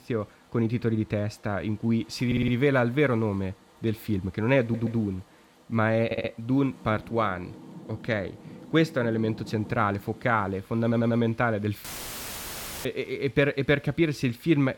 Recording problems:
rain or running water; faint; throughout; 20 dB below the speech
audio stuttering; 4 times, first at 2.5 s
audio cutting out; filled with static; at 12 s for 1 s

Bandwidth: 17.5 kHz